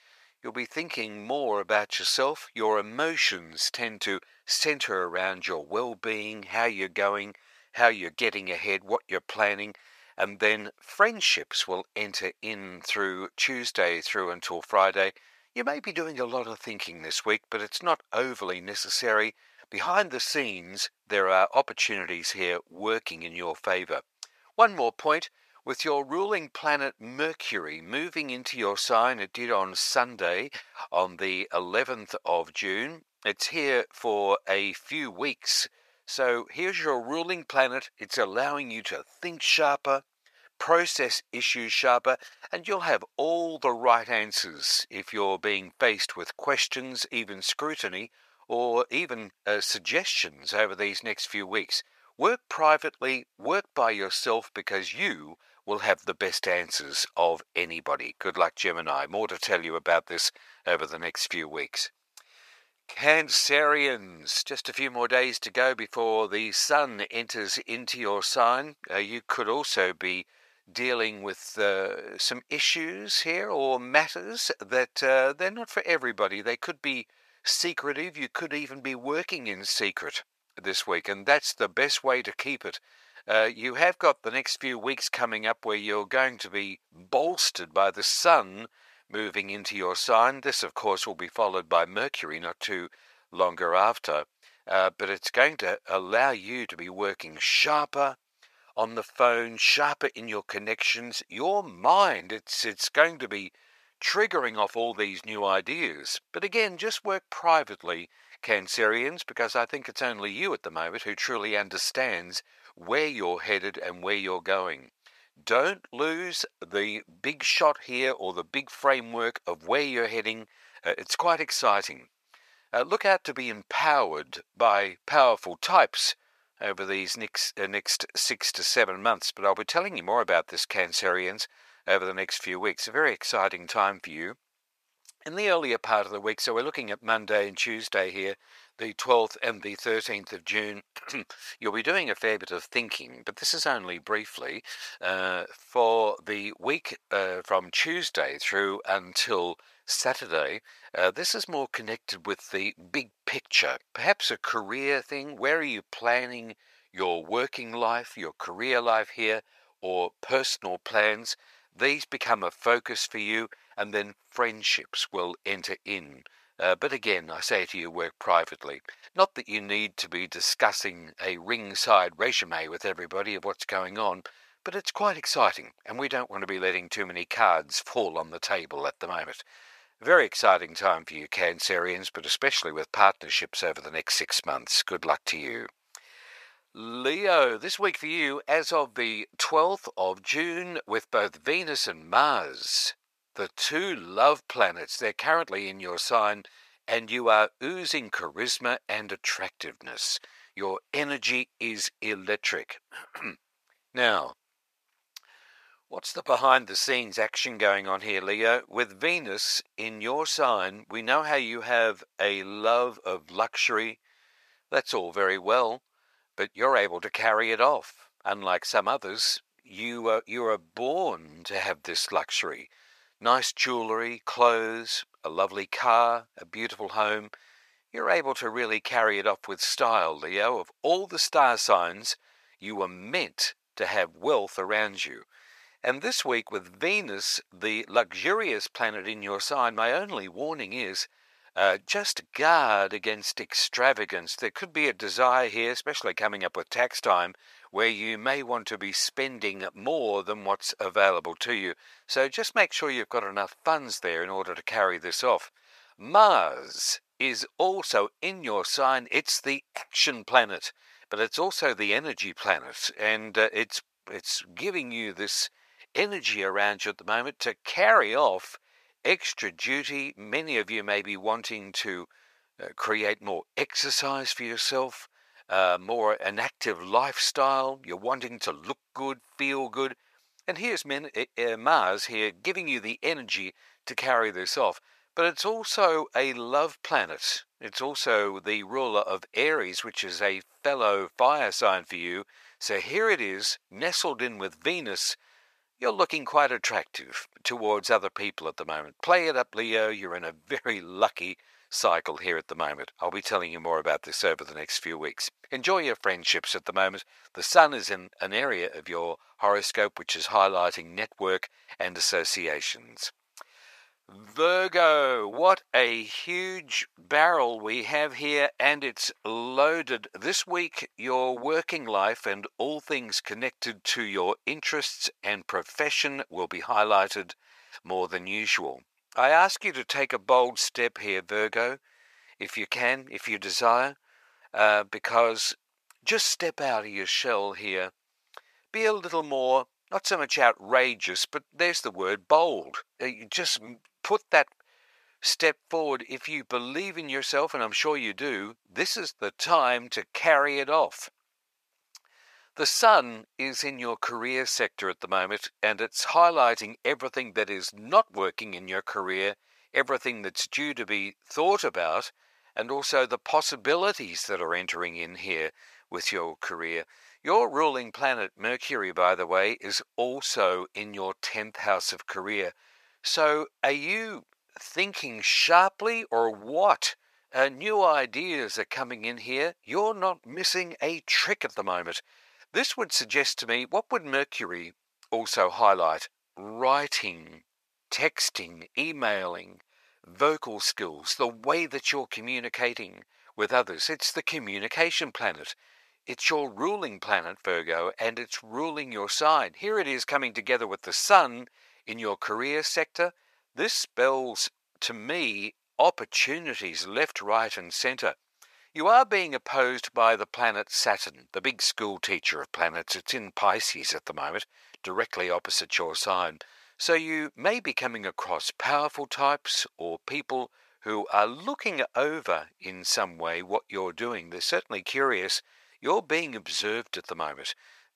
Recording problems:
thin; very; fading below 850 Hz

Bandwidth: 14.5 kHz